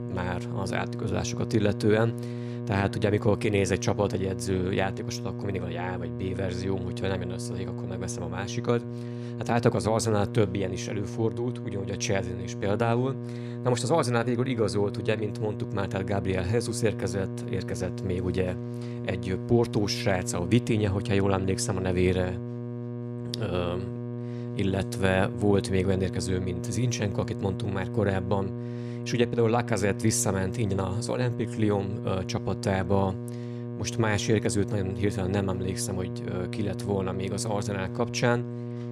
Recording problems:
electrical hum; noticeable; throughout; 60 Hz, 10 dB below the speech

